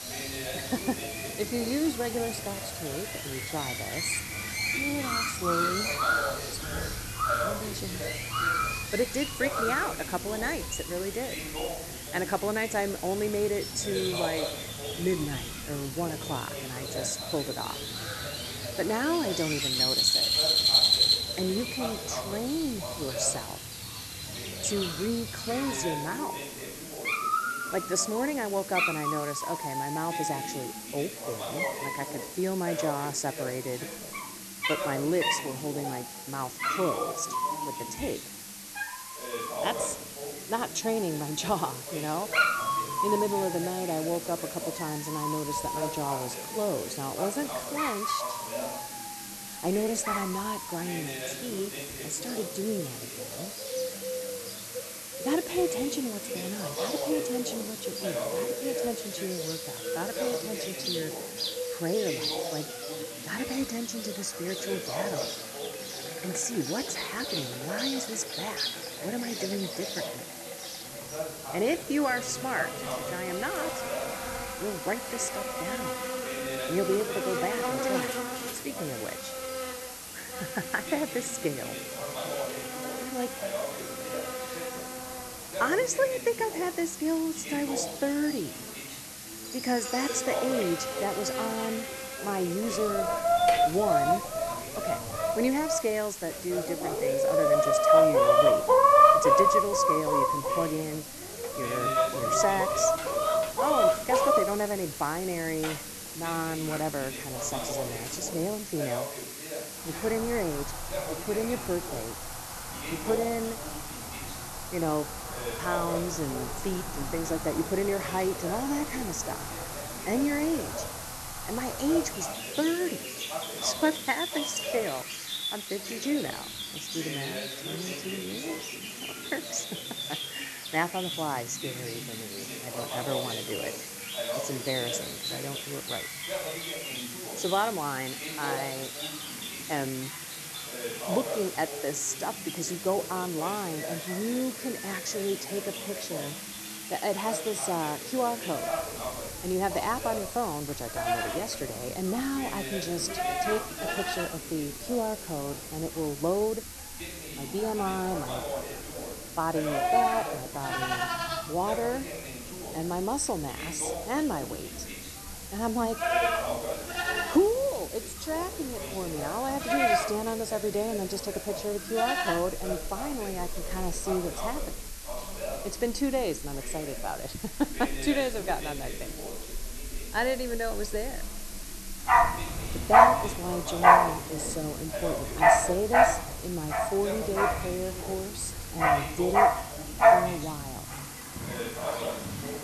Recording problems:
animal sounds; very loud; throughout; 3 dB above the speech
background chatter; loud; throughout; 2 voices, 8 dB below the speech
hiss; loud; throughout; 7 dB below the speech

